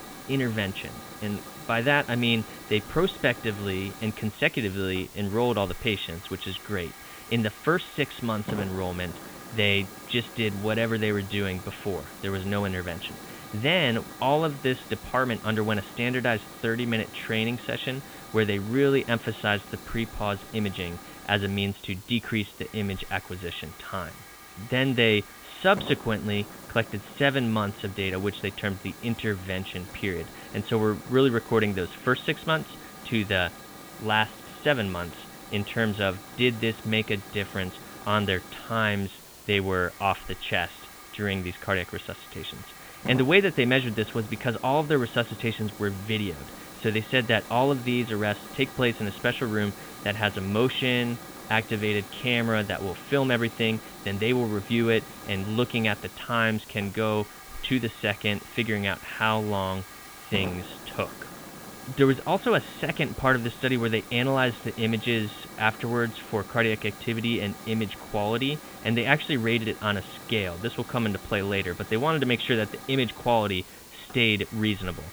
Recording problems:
high frequencies cut off; severe; nothing above 4 kHz
hiss; noticeable; throughout; 15 dB below the speech

